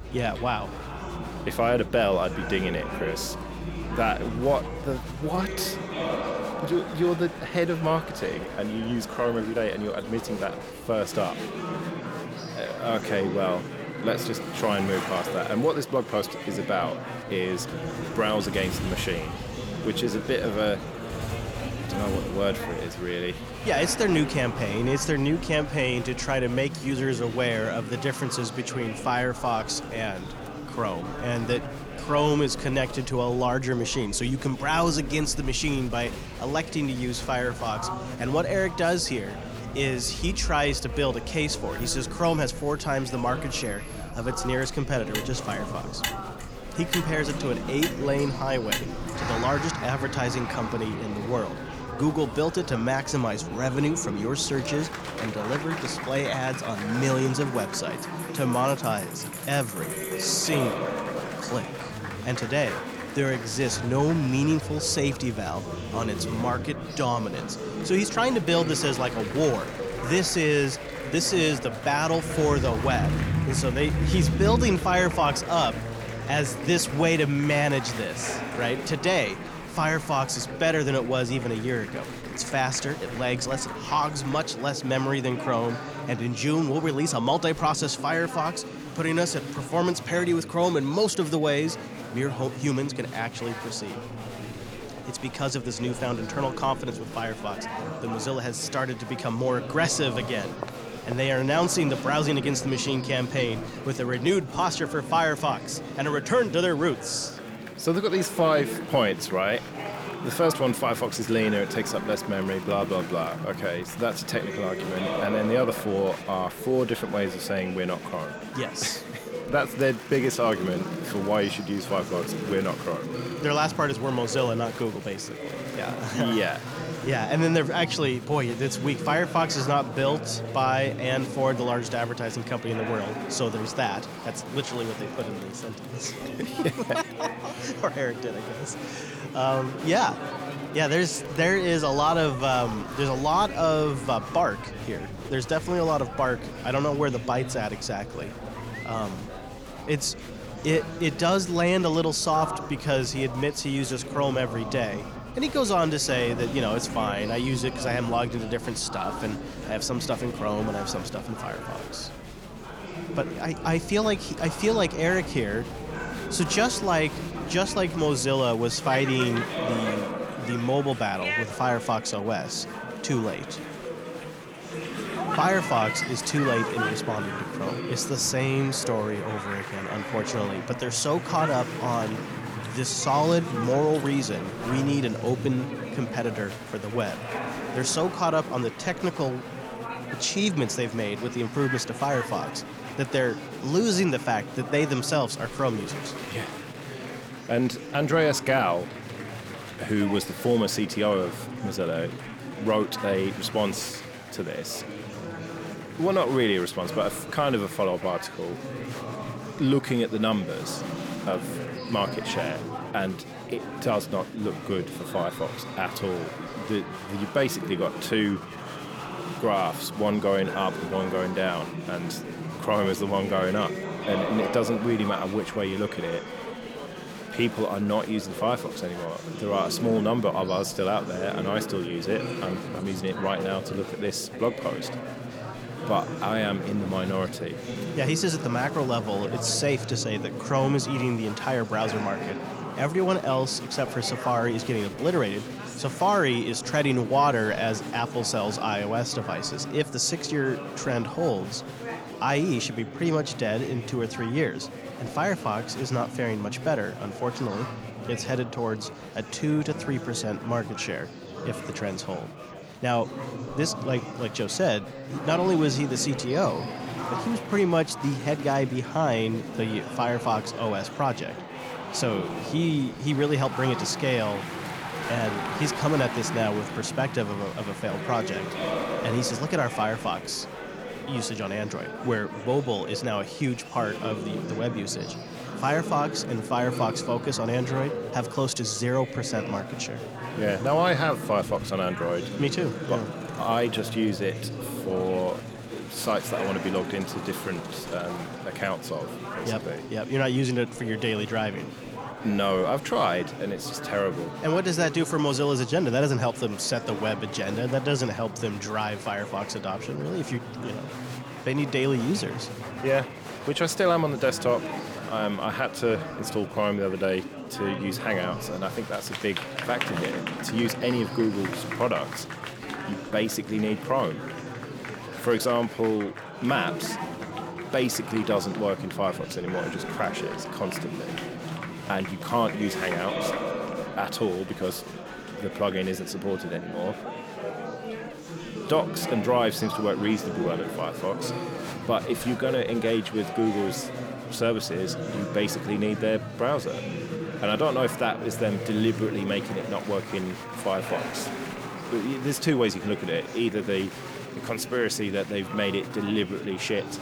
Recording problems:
murmuring crowd; loud; throughout; 8 dB below the speech
traffic noise; noticeable; until 1:24; 10 dB below the speech

